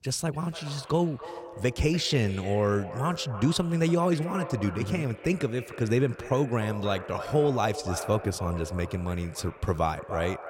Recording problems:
echo of what is said; noticeable; throughout; 290 ms later, 10 dB below the speech

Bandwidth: 16 kHz